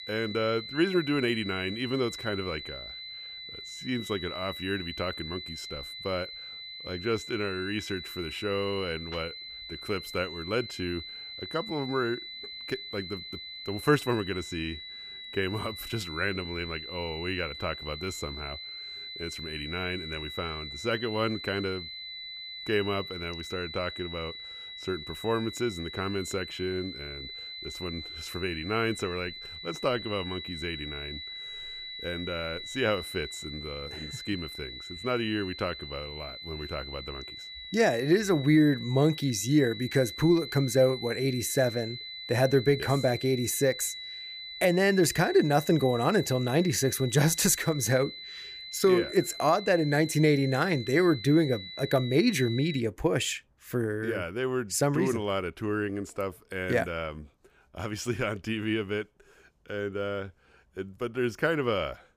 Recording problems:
high-pitched whine; loud; until 53 s; 4 kHz, 10 dB below the speech

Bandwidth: 15 kHz